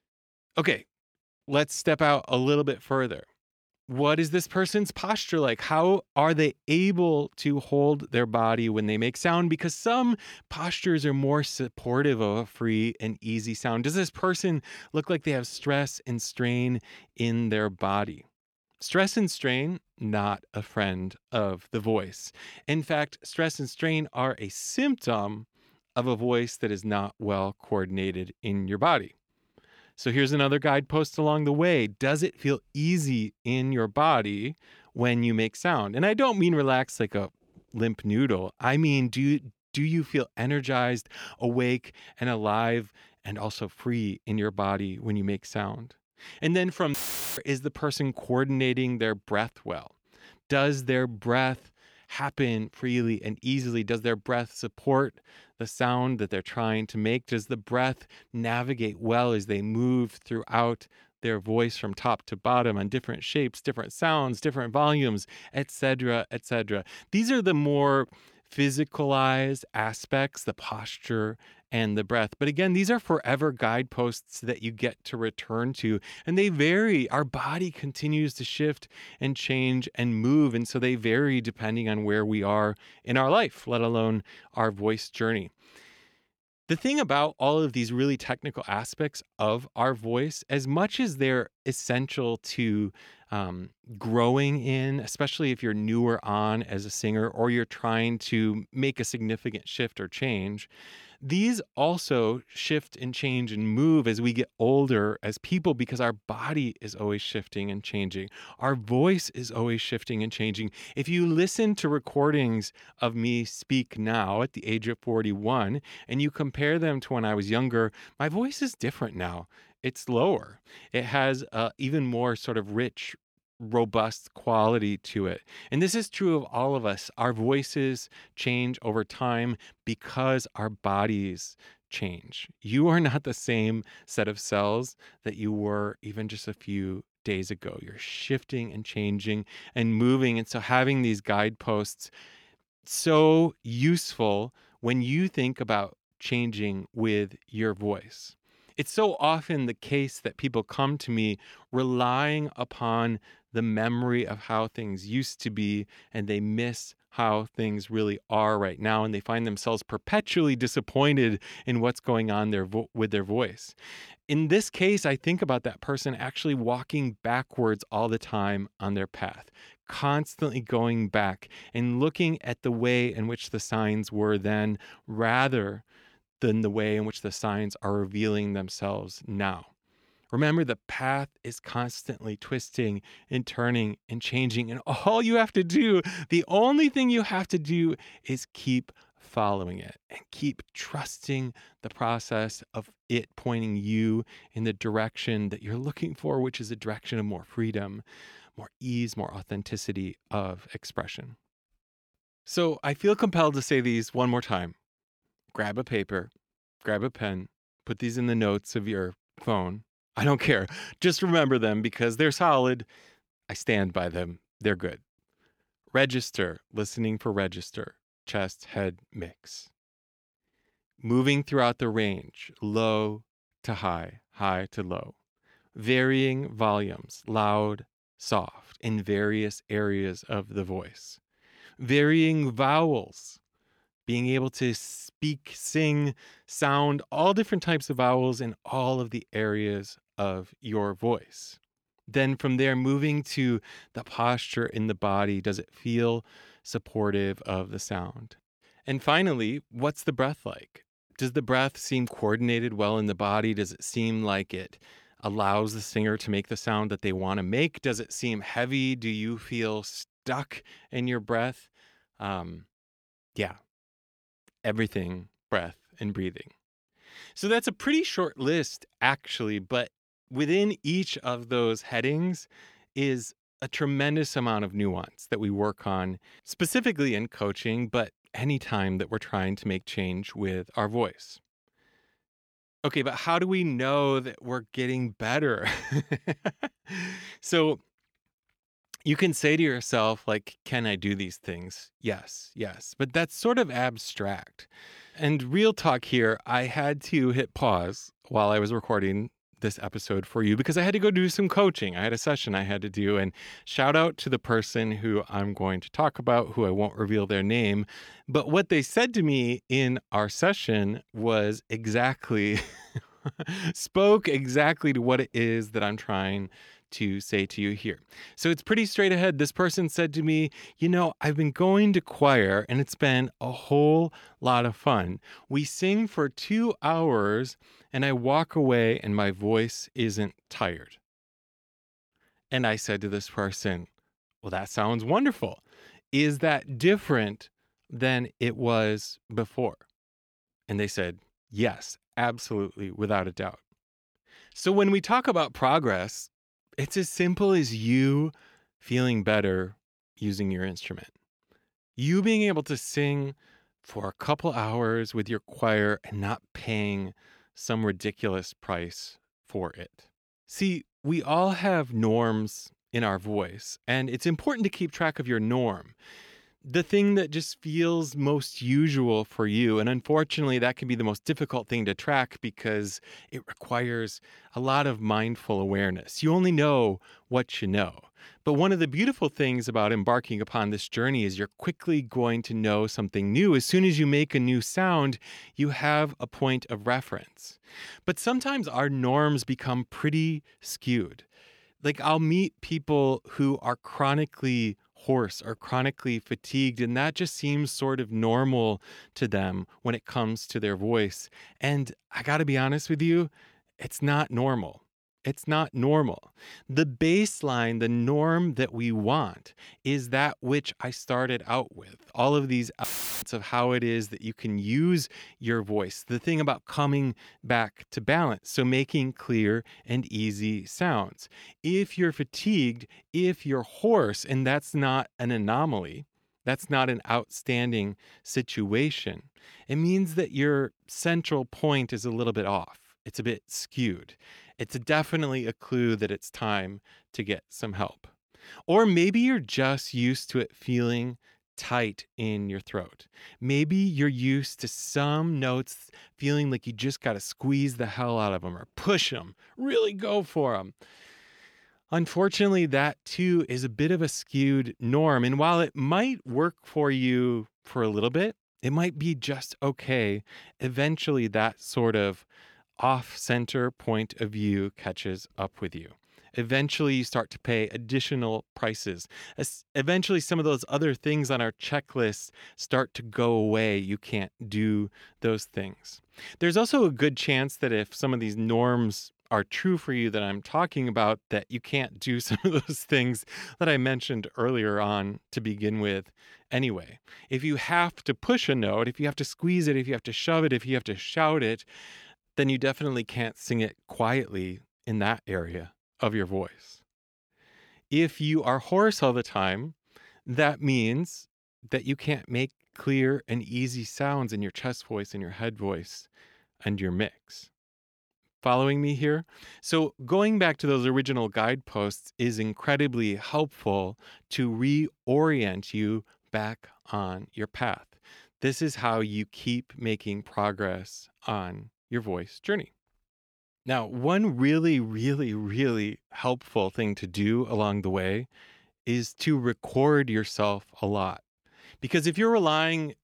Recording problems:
audio cutting out; filled with static; at 47 s and at 6:53

